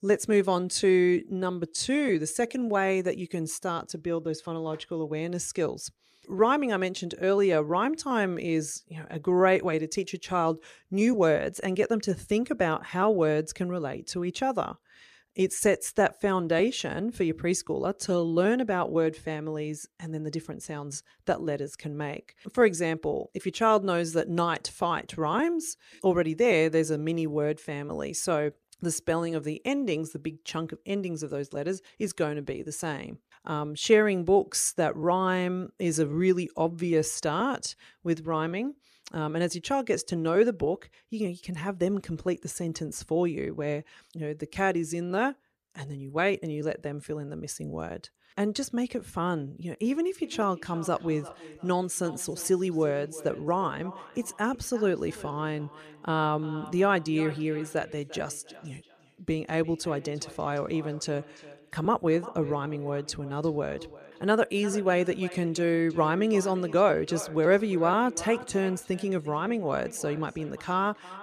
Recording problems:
echo of what is said; noticeable; from 50 s on; 350 ms later, 15 dB below the speech

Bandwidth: 14.5 kHz